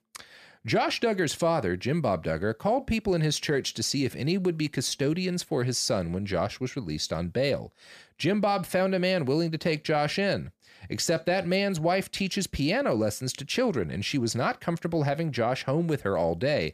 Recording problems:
none

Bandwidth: 15 kHz